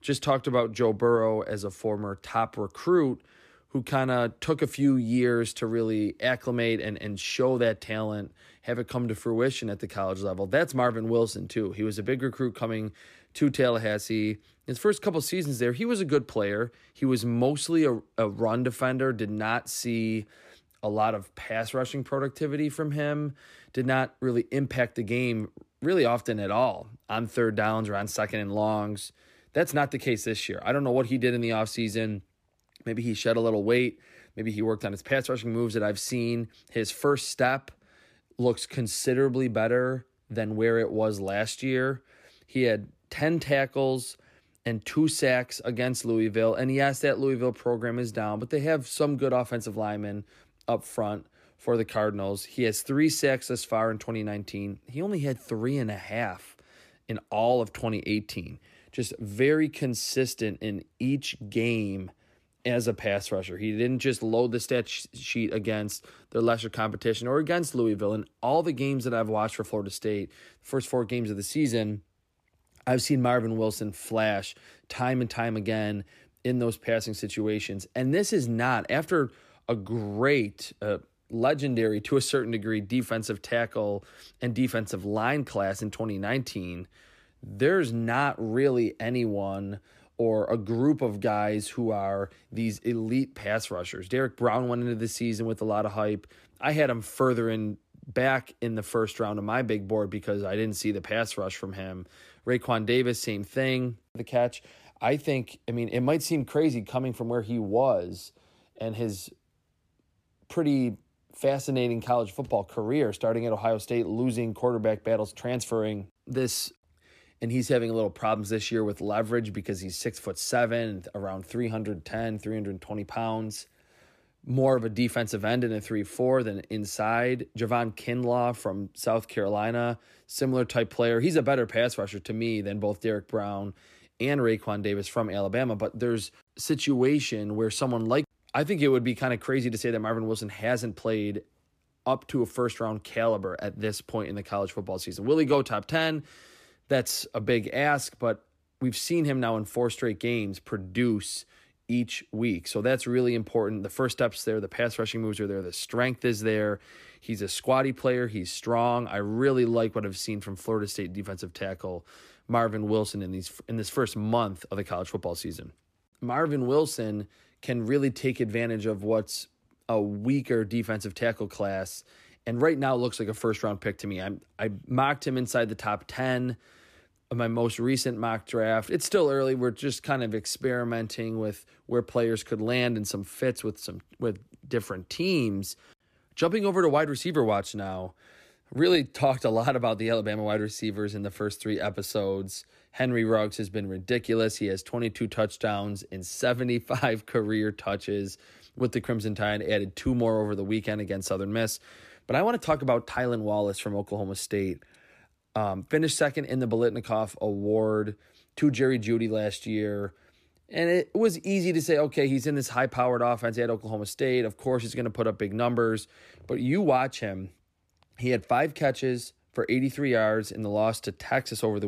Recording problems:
abrupt cut into speech; at the end

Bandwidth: 14.5 kHz